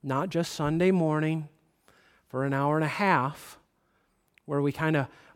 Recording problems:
none

